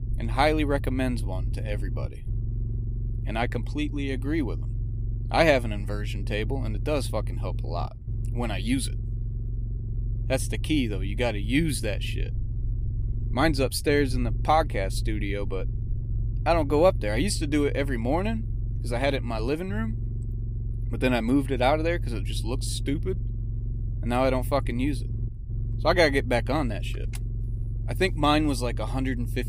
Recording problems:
low rumble; noticeable; throughout; 20 dB below the speech

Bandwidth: 15.5 kHz